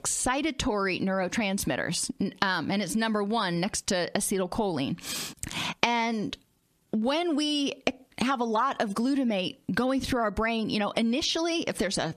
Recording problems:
squashed, flat; heavily

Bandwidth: 14 kHz